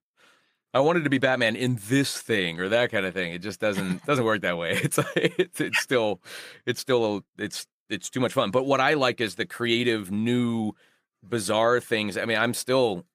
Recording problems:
none

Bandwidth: 15 kHz